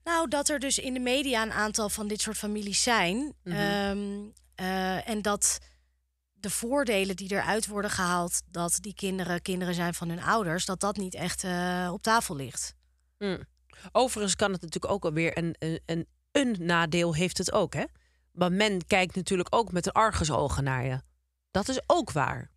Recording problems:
none

